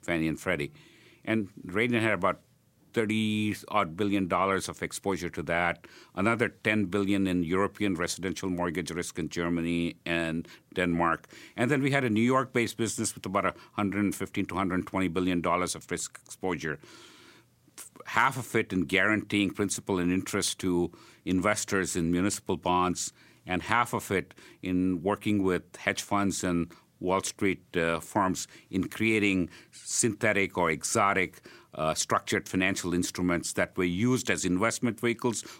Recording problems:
none

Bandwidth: 16 kHz